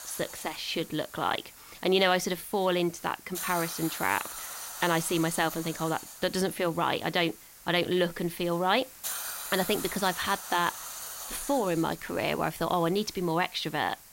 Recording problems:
hiss; noticeable; throughout; 10 dB below the speech

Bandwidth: 16 kHz